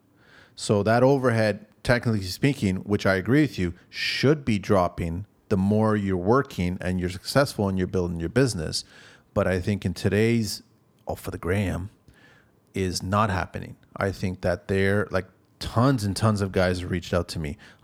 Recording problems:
none

